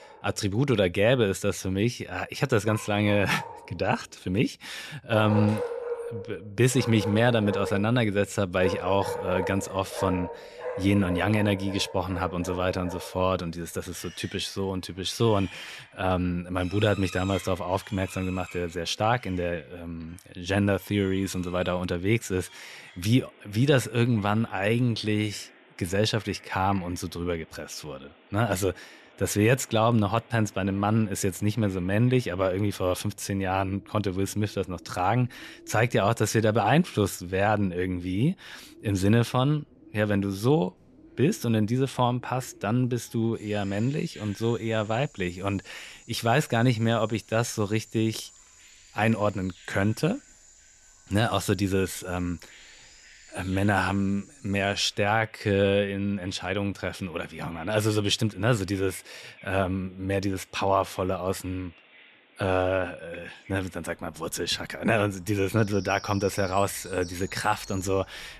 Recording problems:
animal sounds; noticeable; throughout; 15 dB below the speech

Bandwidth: 13.5 kHz